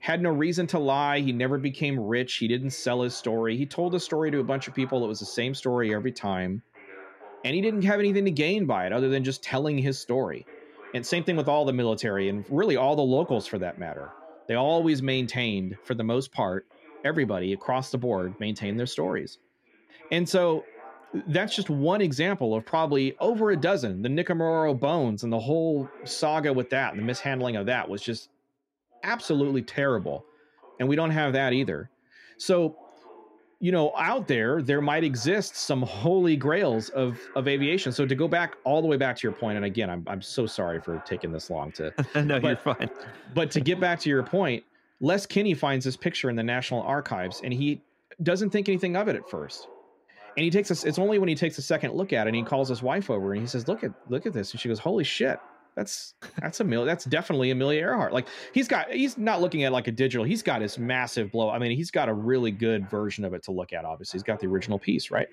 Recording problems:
voice in the background; faint; throughout; 25 dB below the speech

